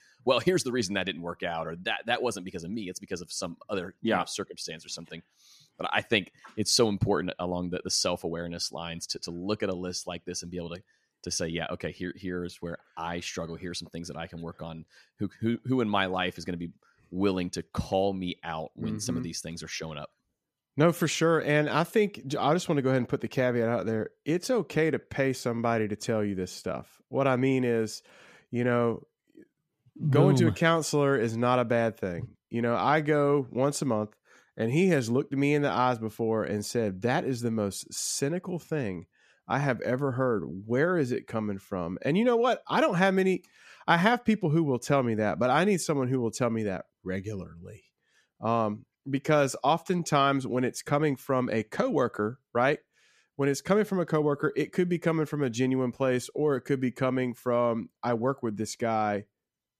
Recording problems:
none

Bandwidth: 14.5 kHz